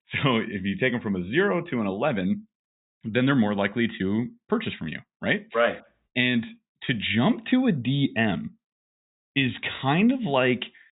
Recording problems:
high frequencies cut off; severe; nothing above 4 kHz

